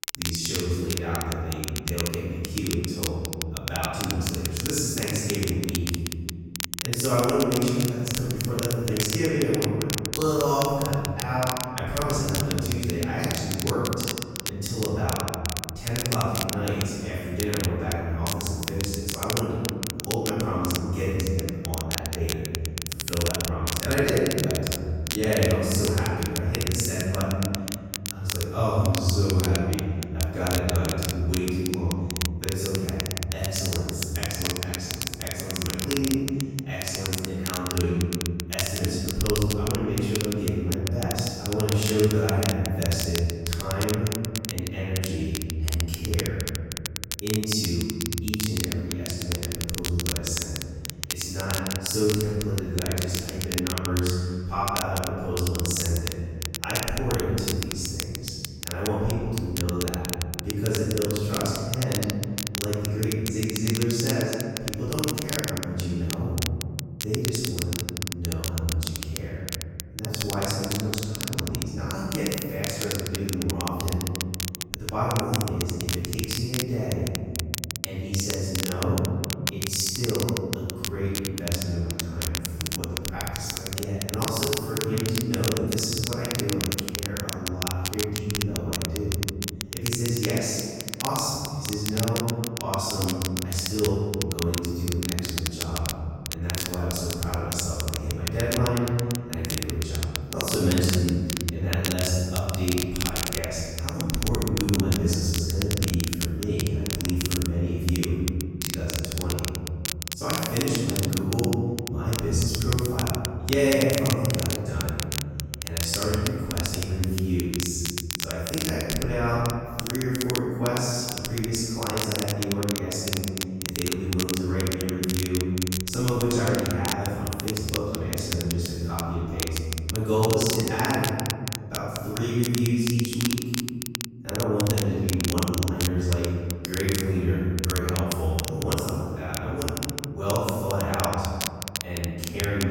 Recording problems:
room echo; strong; dies away in 2.1 s
off-mic speech; far
crackle, like an old record; very faint; 5 dB below the speech
abrupt cut into speech; at the end

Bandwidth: 16 kHz